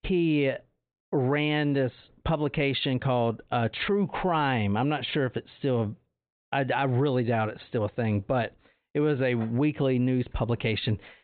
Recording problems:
high frequencies cut off; severe; nothing above 4 kHz

